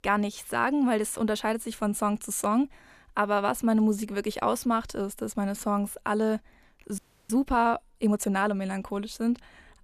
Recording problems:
audio freezing; at 7 s

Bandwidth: 14.5 kHz